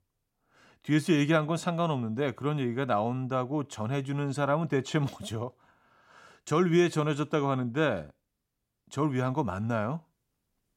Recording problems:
none

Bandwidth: 16.5 kHz